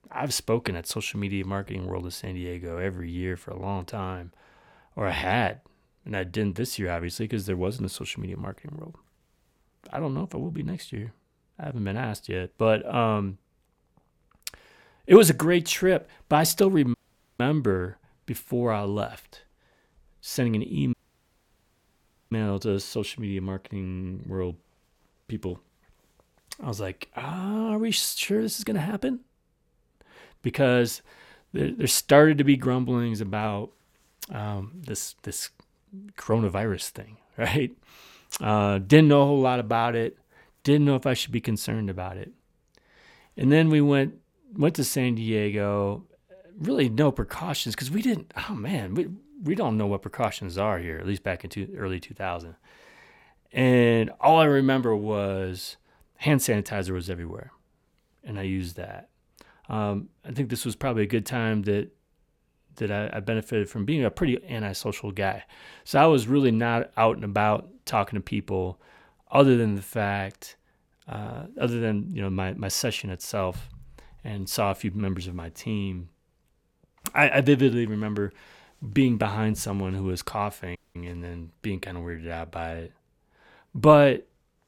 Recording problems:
audio cutting out; at 17 s, at 21 s for 1.5 s and at 1:21

